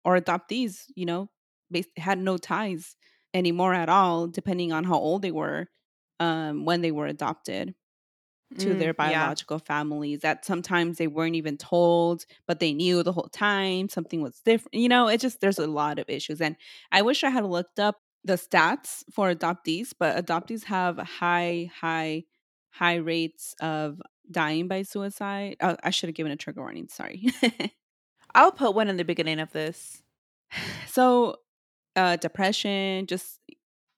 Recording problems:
none

